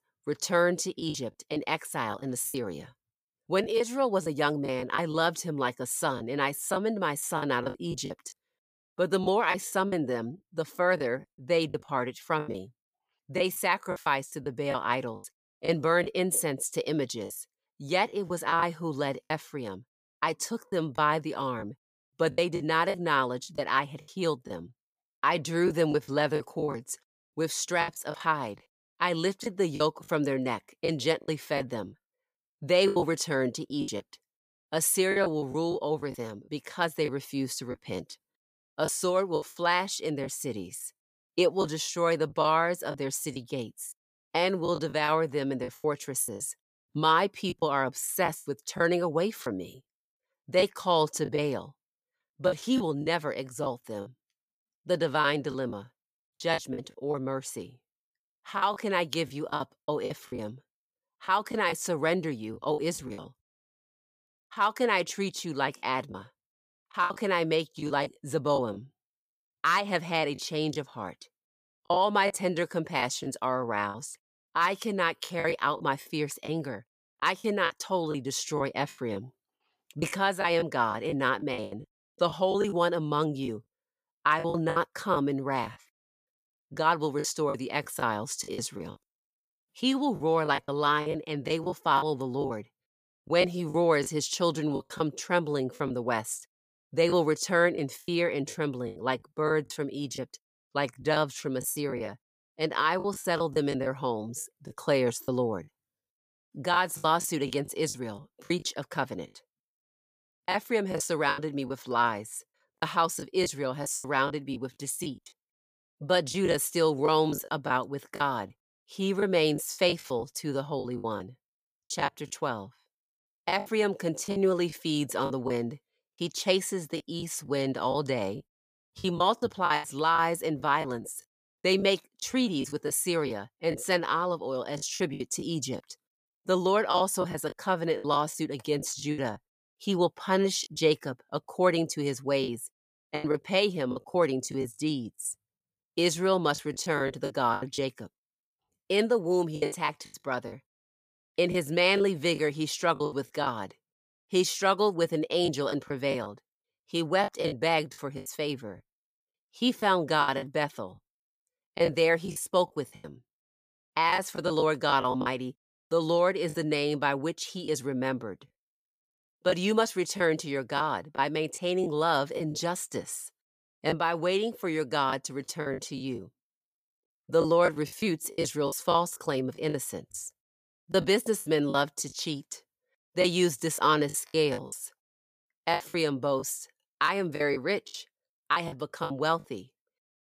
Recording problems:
choppy; very; 9% of the speech affected

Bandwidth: 15 kHz